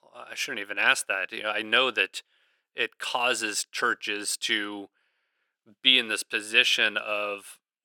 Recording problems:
thin; somewhat; fading below 300 Hz

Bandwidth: 17 kHz